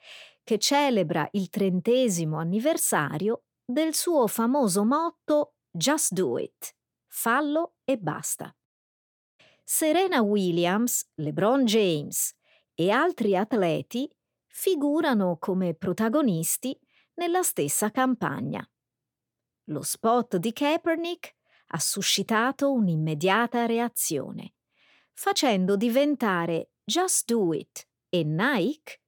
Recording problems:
none

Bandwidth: 17.5 kHz